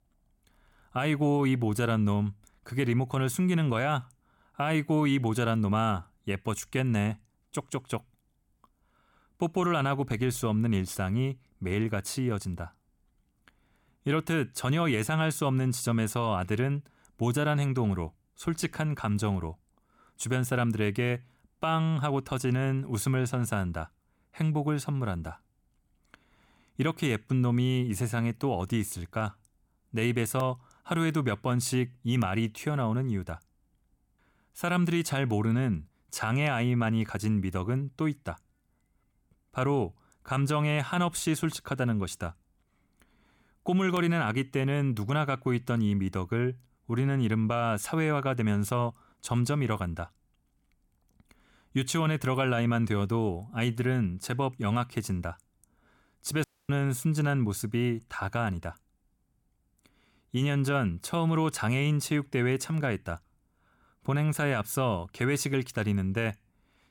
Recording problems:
audio cutting out; at 56 s

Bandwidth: 17.5 kHz